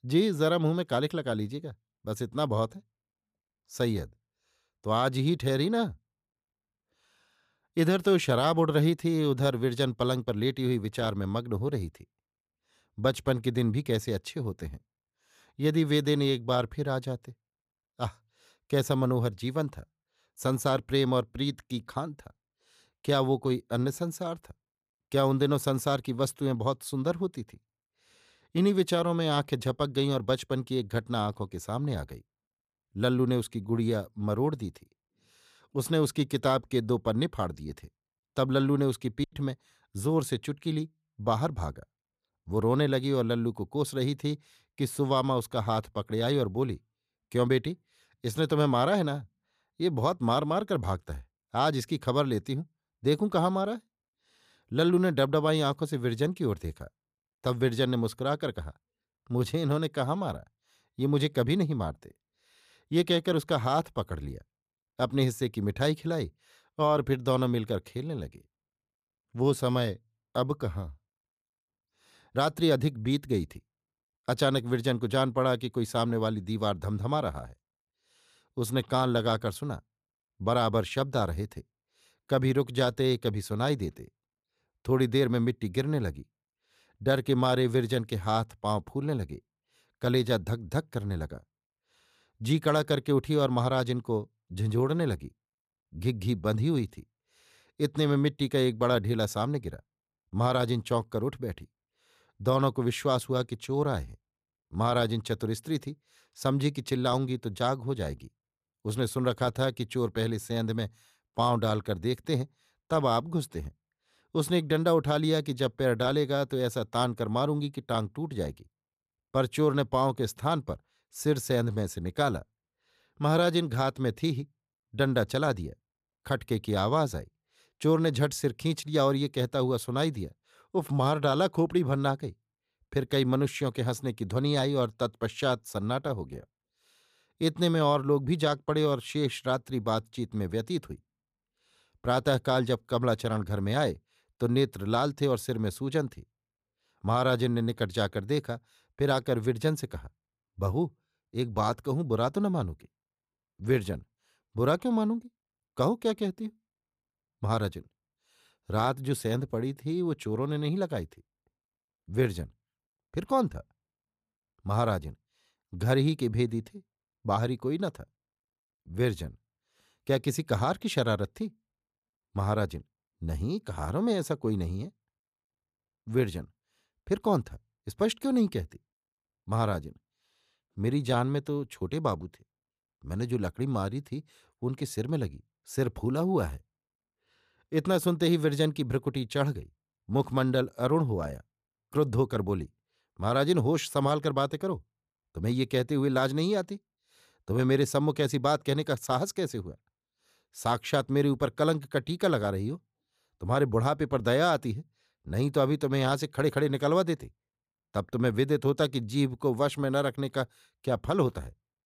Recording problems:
choppy; very; at 39 s; 9% of the speech affected

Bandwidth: 14.5 kHz